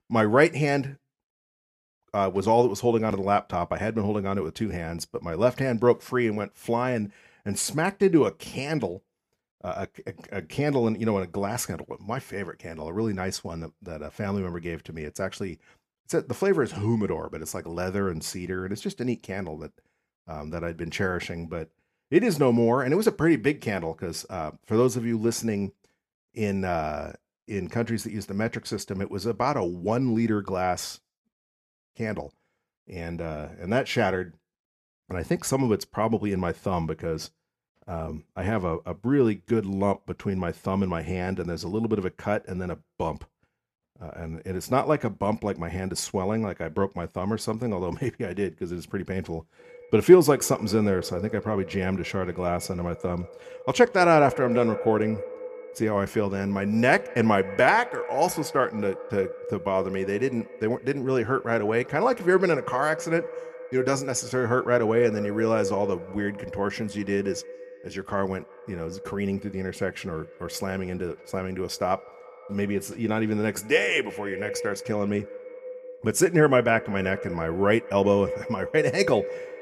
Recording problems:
echo of what is said; strong; from 50 s on; 170 ms later, 10 dB below the speech

